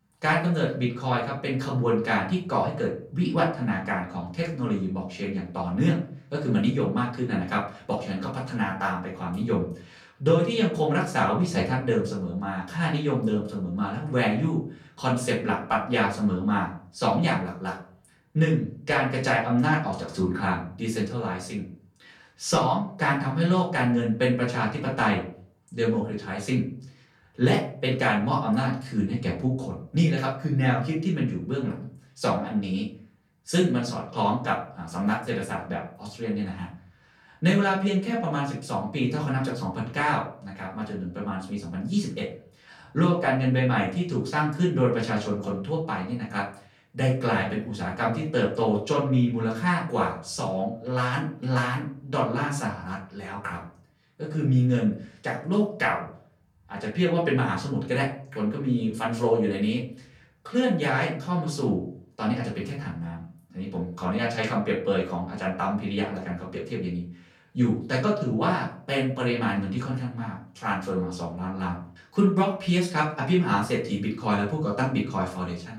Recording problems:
off-mic speech; far
room echo; slight; dies away in 0.4 s

